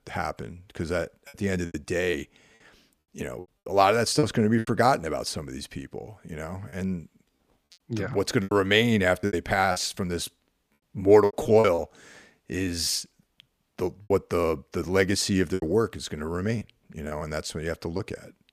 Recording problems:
choppy; very; 8% of the speech affected

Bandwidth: 15 kHz